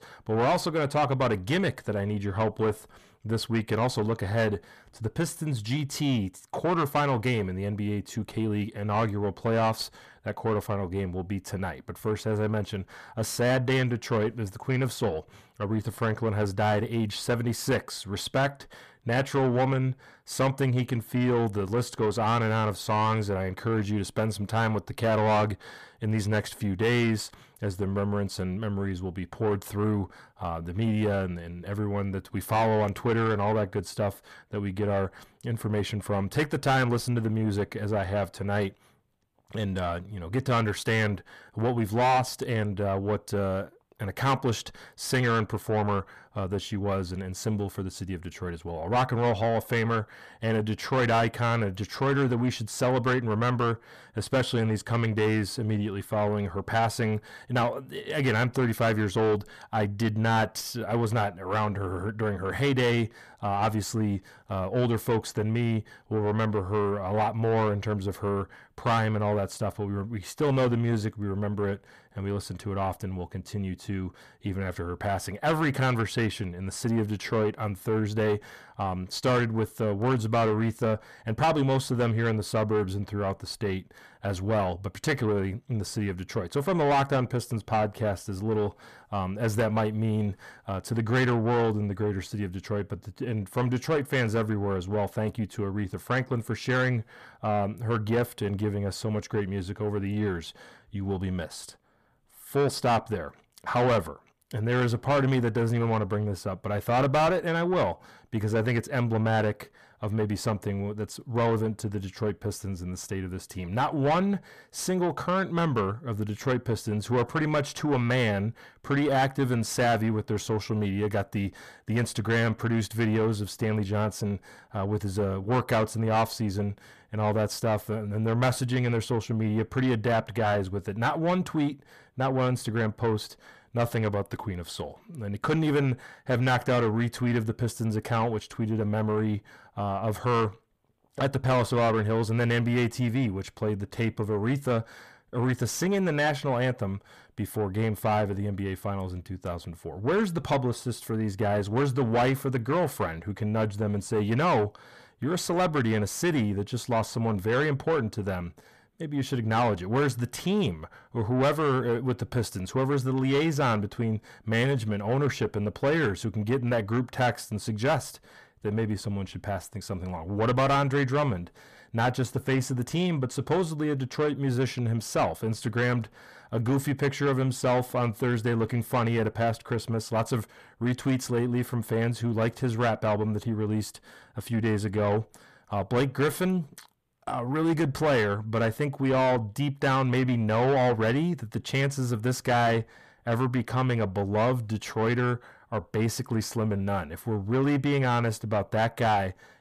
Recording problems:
distortion; heavy; 7 dB below the speech

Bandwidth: 14.5 kHz